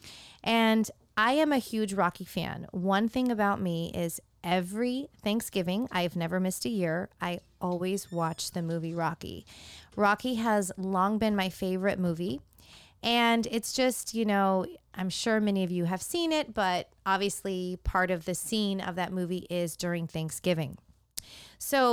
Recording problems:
abrupt cut into speech; at the end

